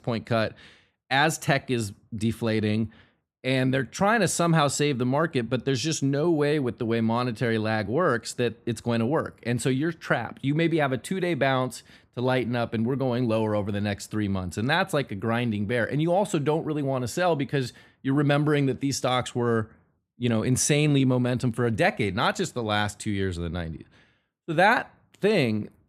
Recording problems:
none

